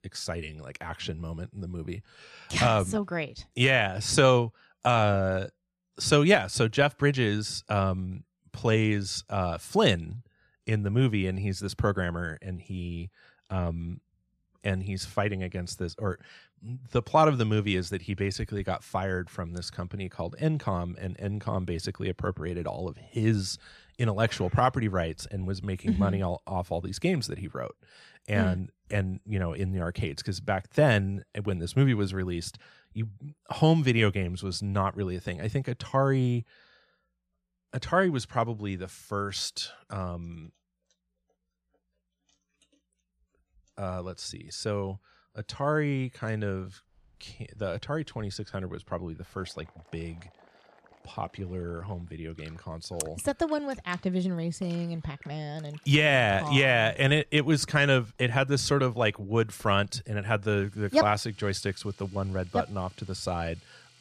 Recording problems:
household noises; faint; from 47 s on; 30 dB below the speech

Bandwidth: 14.5 kHz